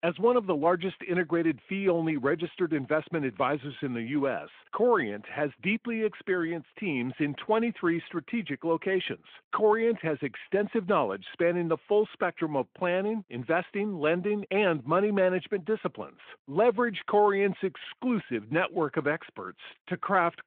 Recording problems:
phone-call audio

